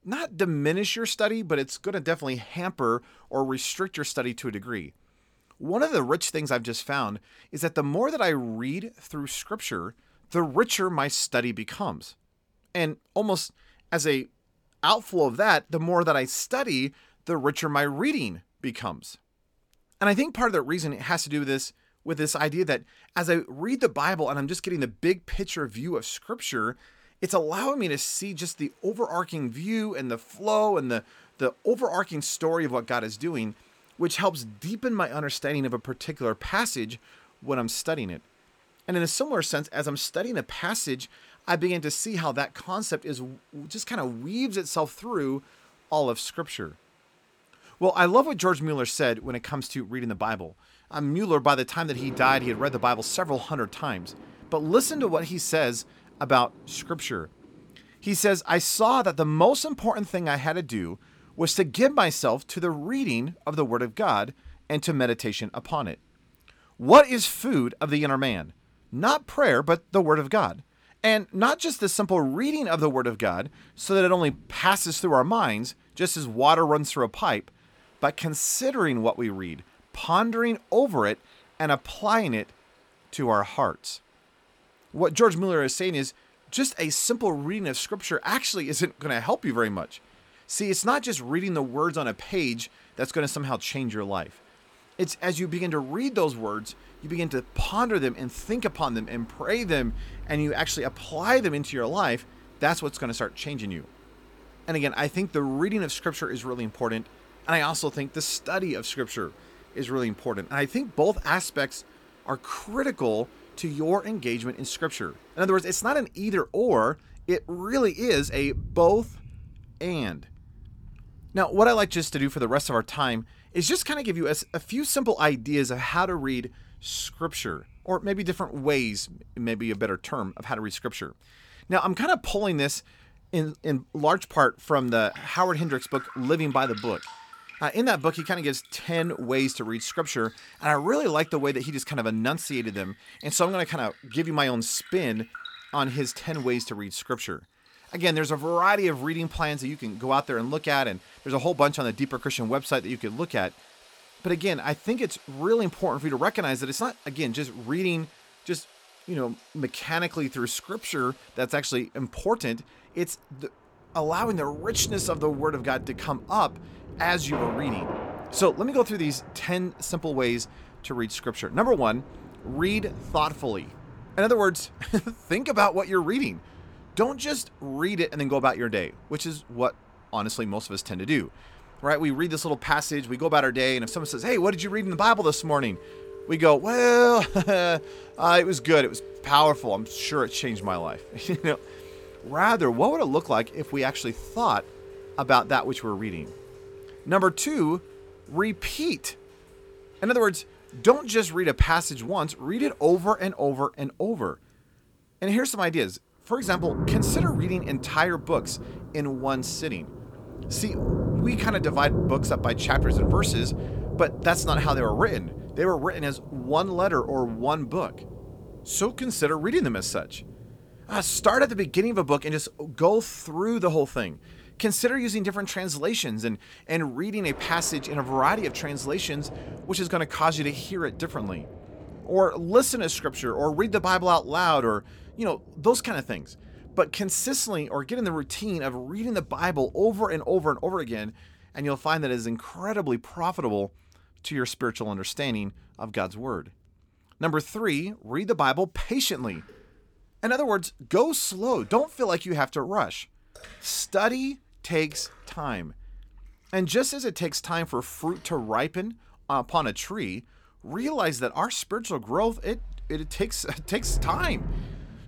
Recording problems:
rain or running water; noticeable; throughout; 15 dB below the speech

